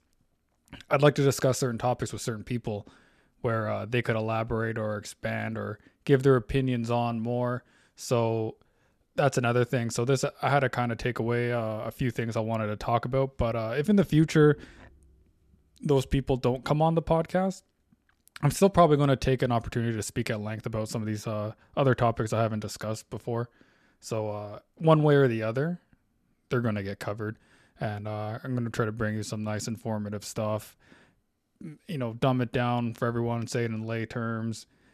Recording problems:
none

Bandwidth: 14 kHz